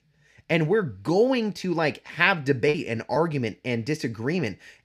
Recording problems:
choppy; occasionally; 2% of the speech affected

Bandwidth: 14.5 kHz